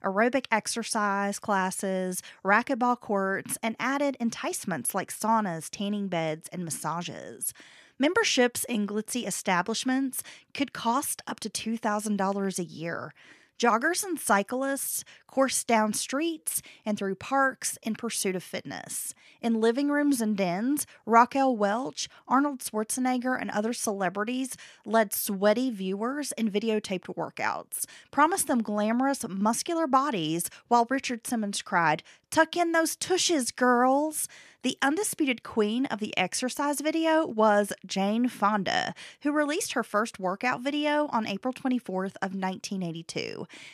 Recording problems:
none

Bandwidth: 14.5 kHz